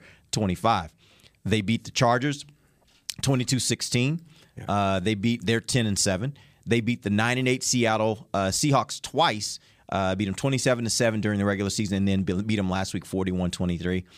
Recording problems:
none

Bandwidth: 15 kHz